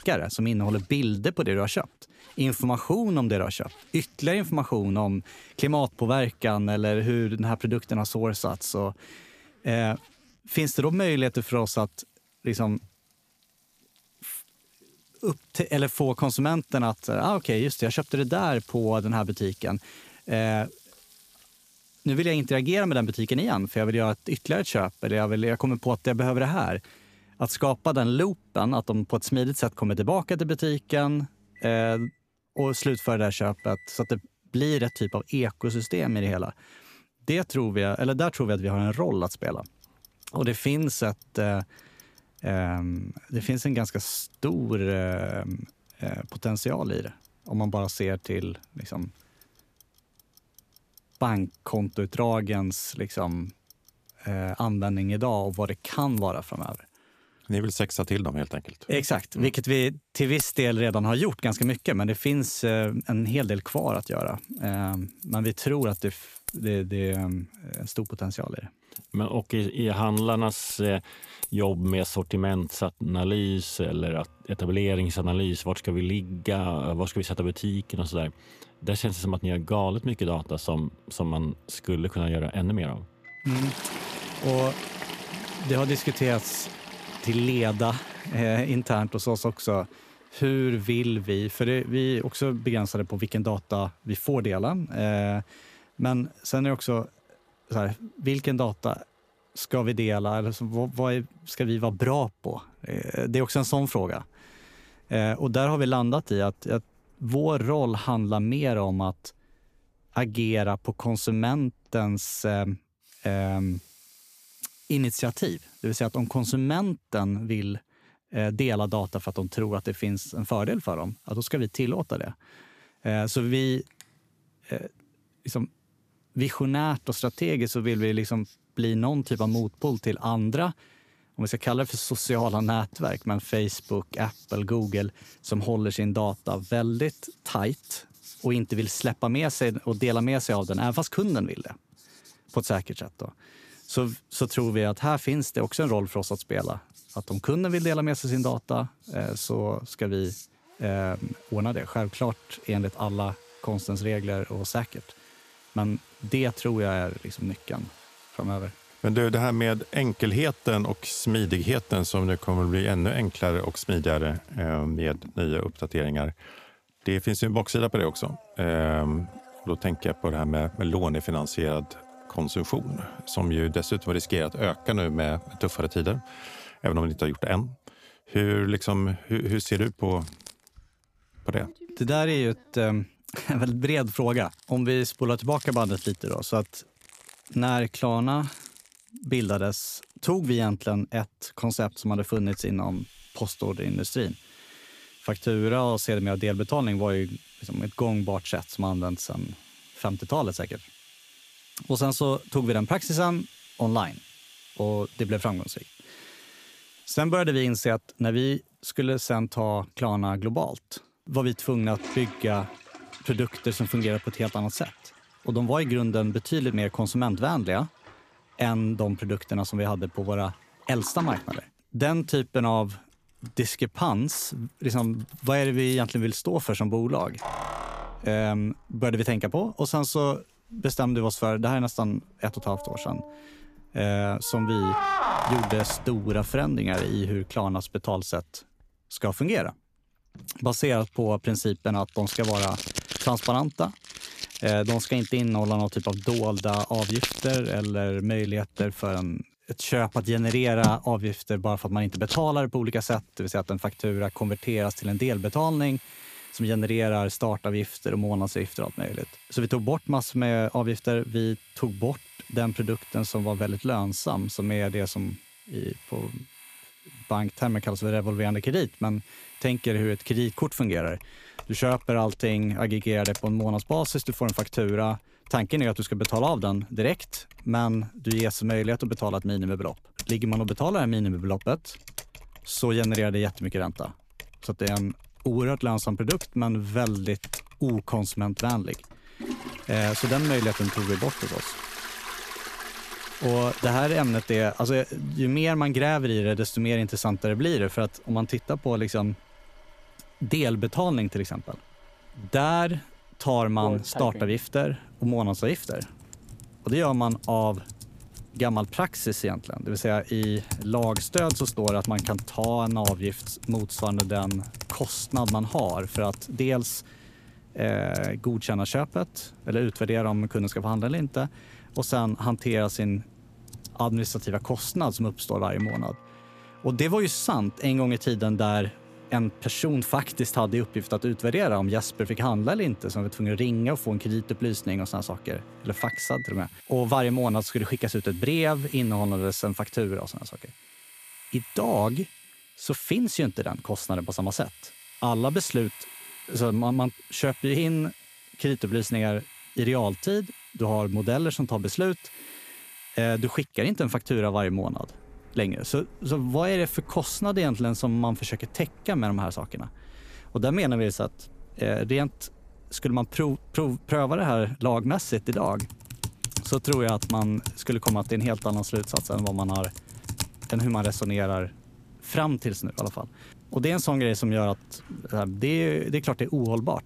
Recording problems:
household noises; noticeable; throughout; 15 dB below the speech

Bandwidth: 14.5 kHz